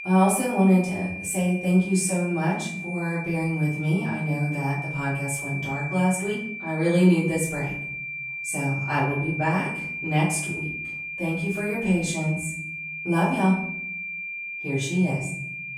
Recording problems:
off-mic speech; far
room echo; noticeable; dies away in 0.7 s
high-pitched whine; loud; throughout; 2.5 kHz, 7 dB below the speech

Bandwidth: 18.5 kHz